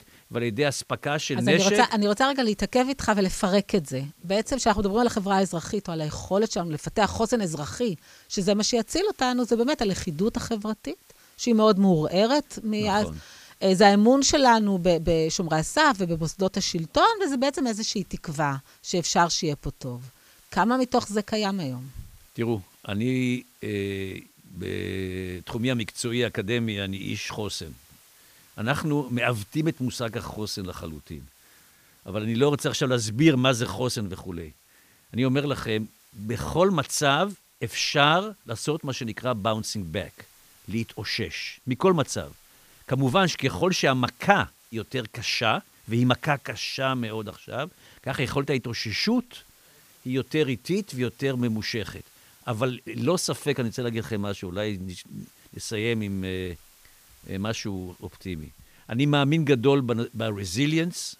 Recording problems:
hiss; faint; throughout; 30 dB below the speech

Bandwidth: 15 kHz